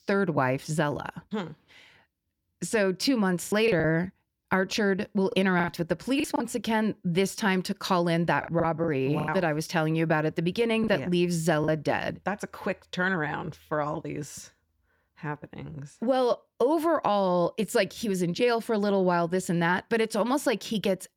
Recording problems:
choppy; very; from 3.5 to 6.5 s, at 8.5 s and at 11 s; 12% of the speech affected

